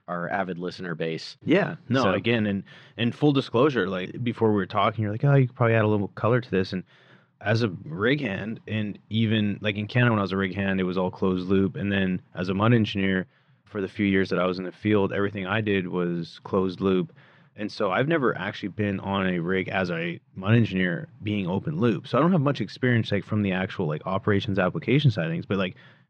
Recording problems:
muffled; very slightly; fading above 4 kHz

